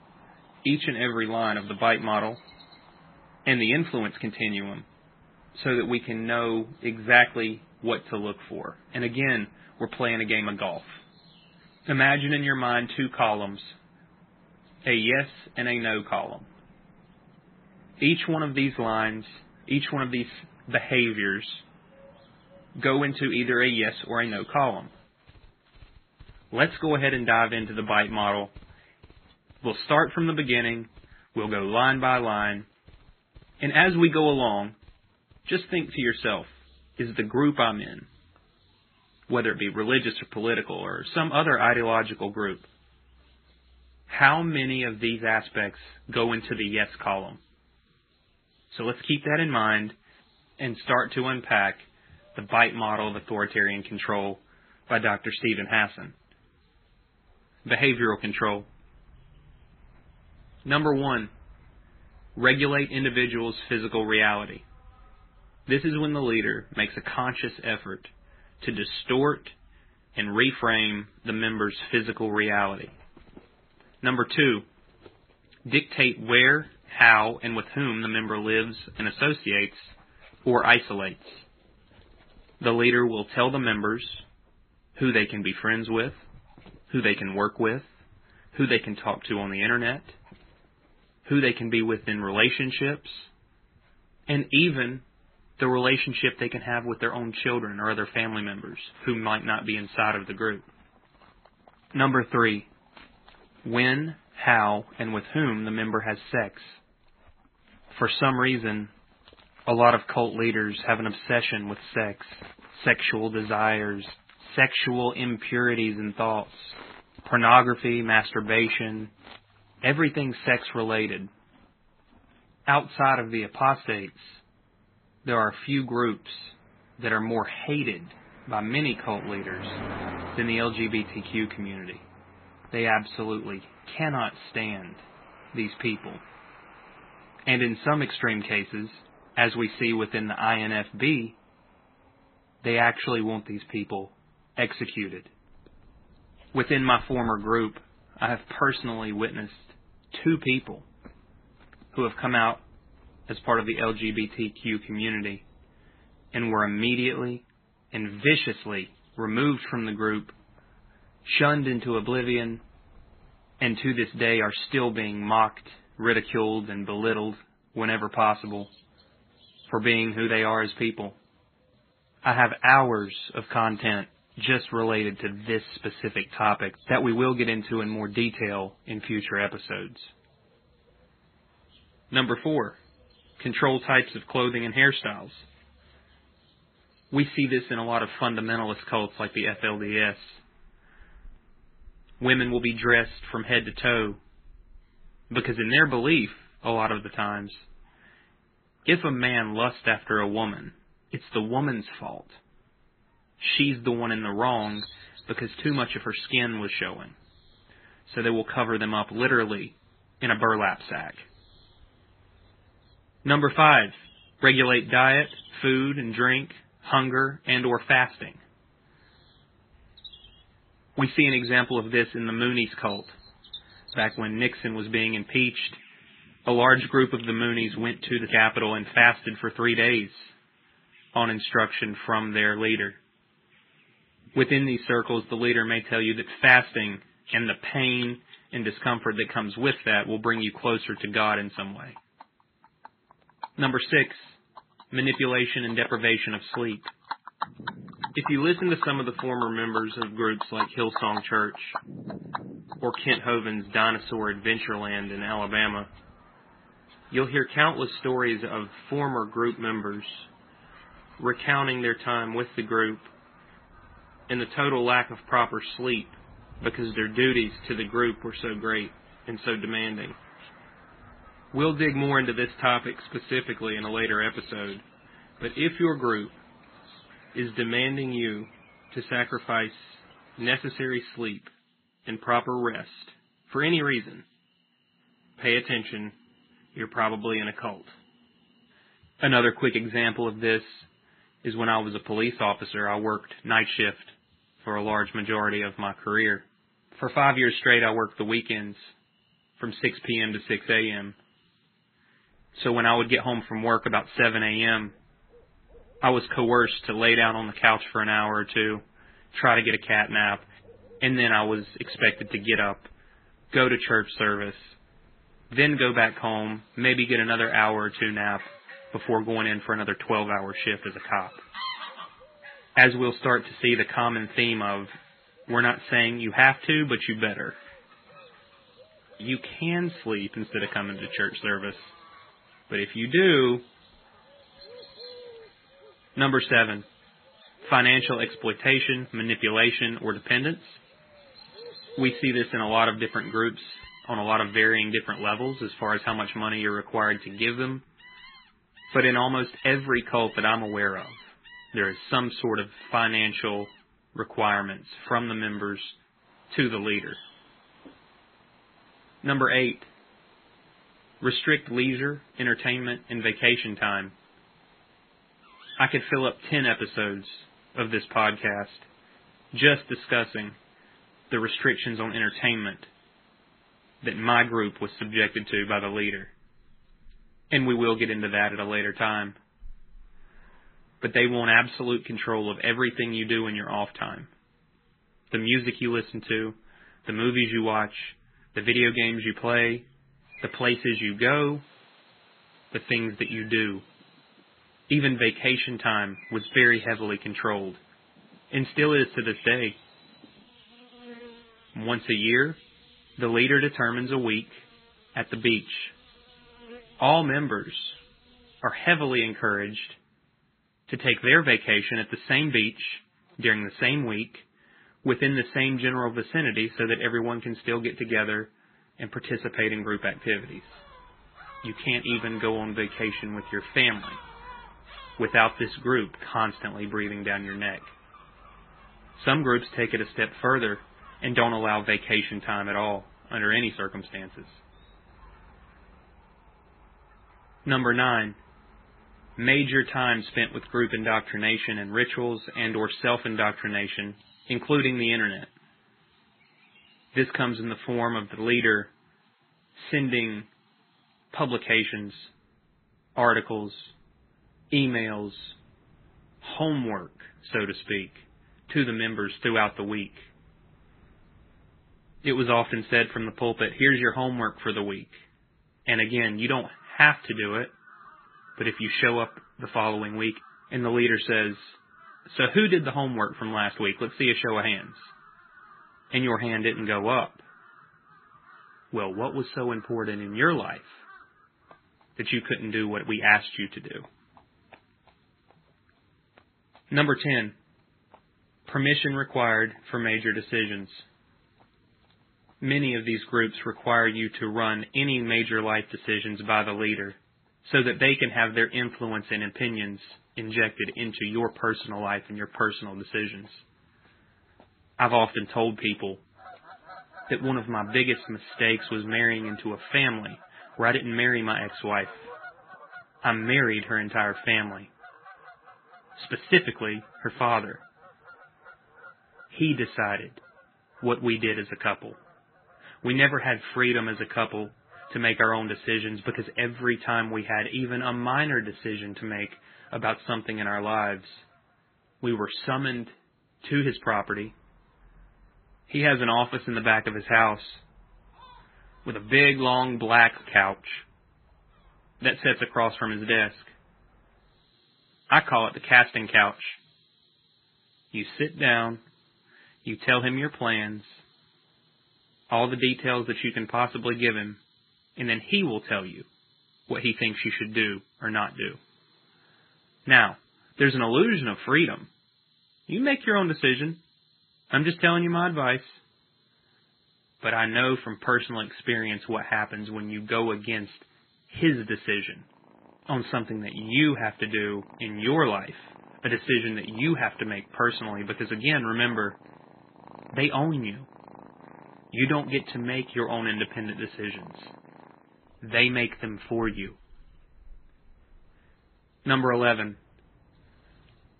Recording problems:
garbled, watery; badly; nothing above 3.5 kHz
animal sounds; faint; throughout; 25 dB below the speech

